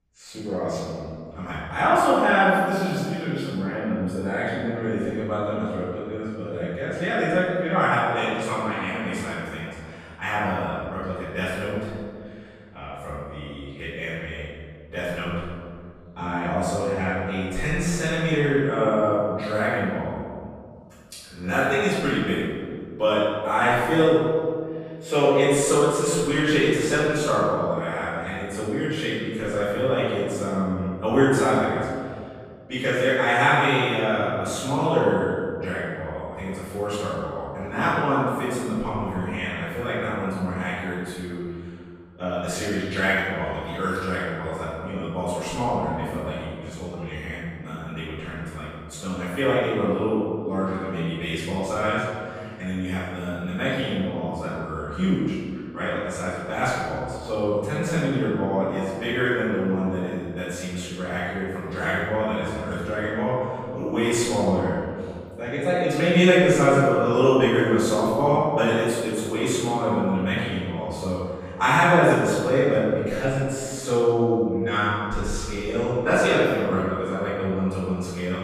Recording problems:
room echo; strong; dies away in 1.9 s
off-mic speech; far

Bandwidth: 15 kHz